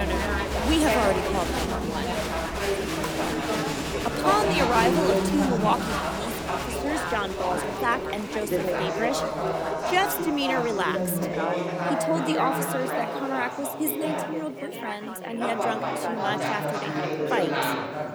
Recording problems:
chatter from many people; very loud; throughout; 1 dB above the speech
abrupt cut into speech; at the start

